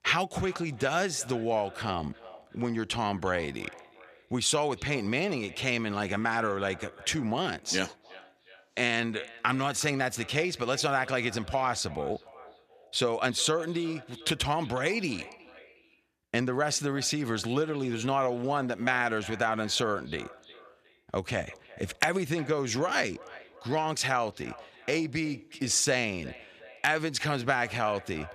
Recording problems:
echo of what is said; faint; throughout; 360 ms later, 20 dB below the speech

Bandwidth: 14.5 kHz